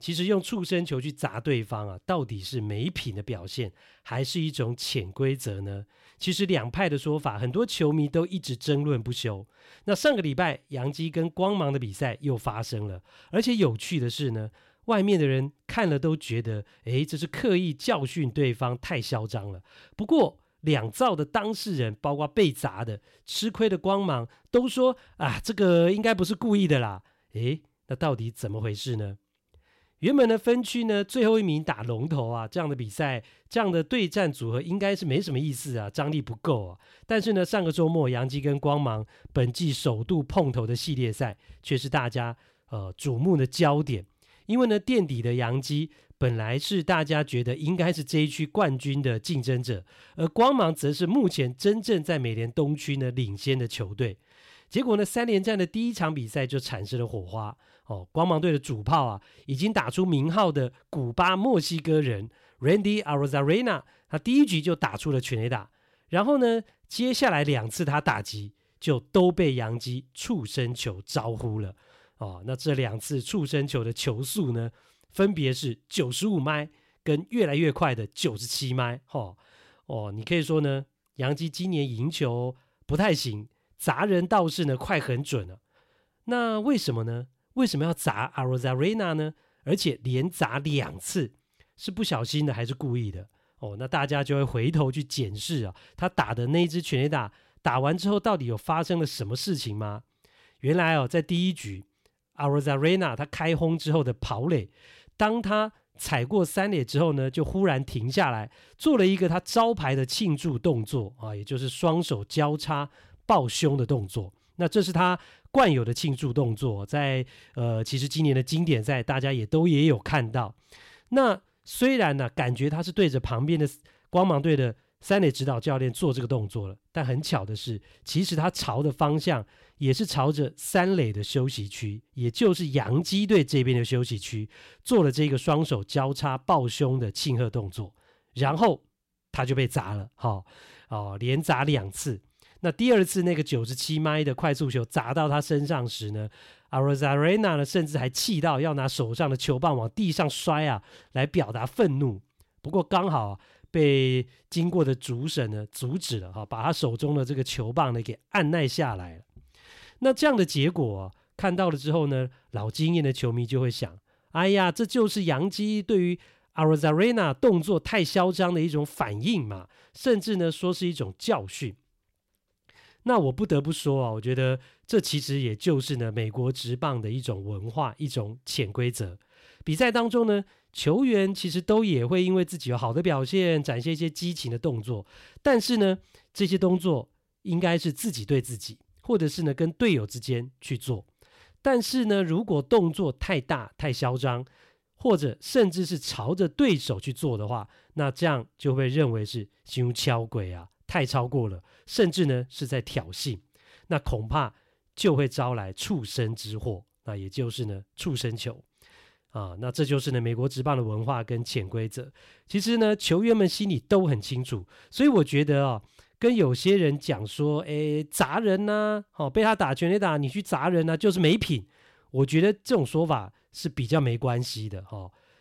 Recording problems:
none

